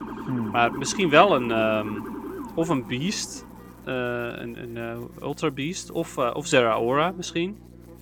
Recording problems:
electrical hum; faint; throughout; 60 Hz, 30 dB below the speech
siren; noticeable; until 4 s; peak 9 dB below the speech

